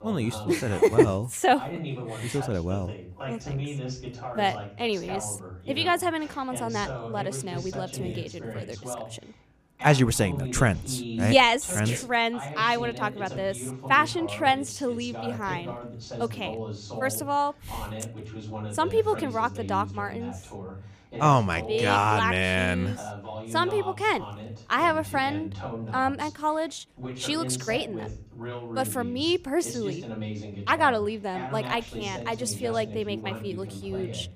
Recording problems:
voice in the background; noticeable; throughout; 10 dB below the speech

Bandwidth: 15 kHz